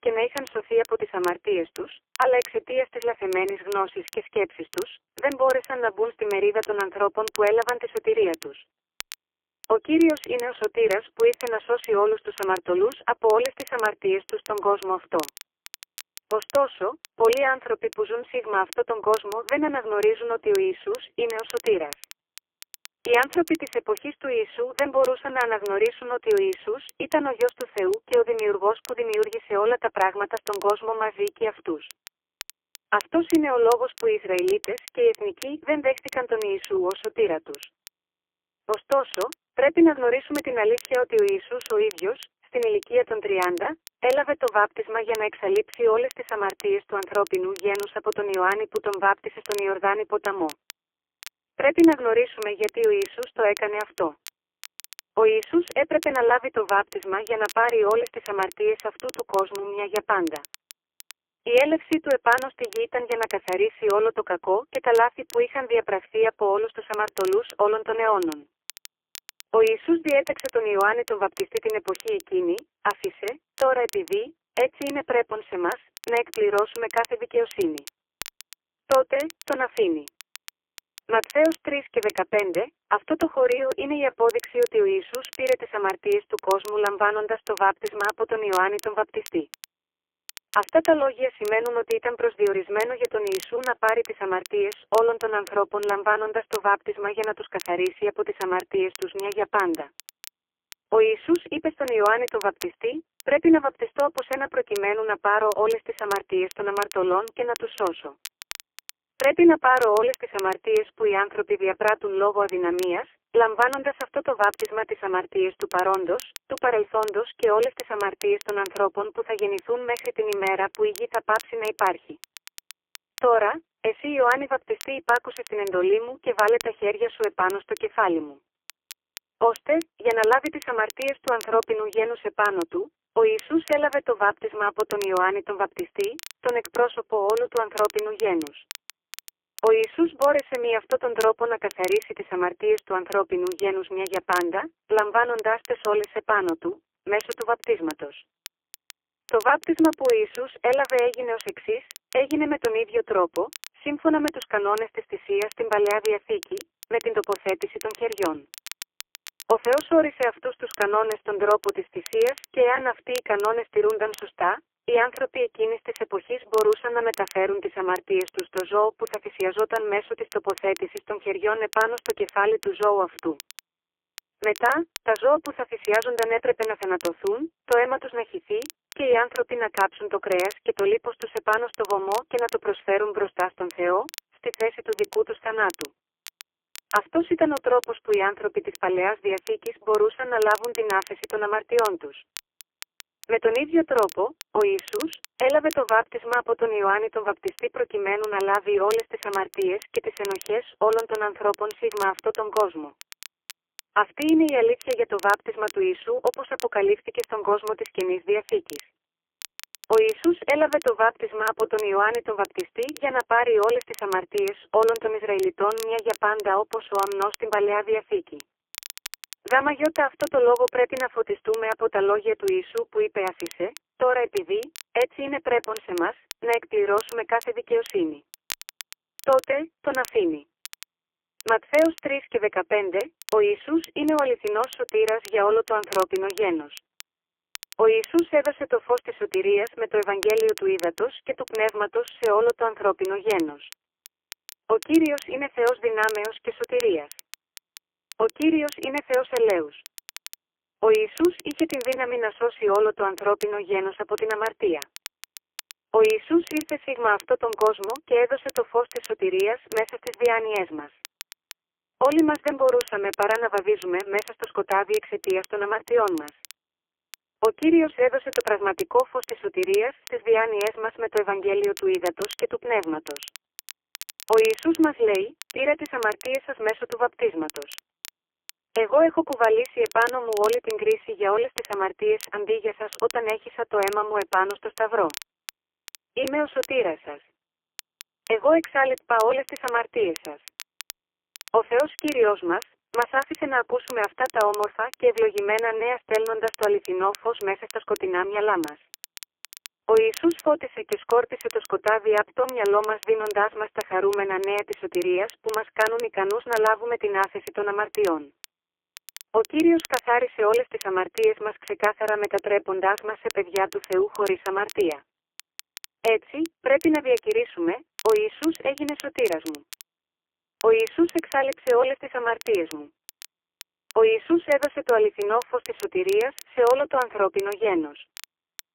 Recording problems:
phone-call audio; poor line; nothing above 3 kHz
crackle, like an old record; noticeable; 20 dB below the speech

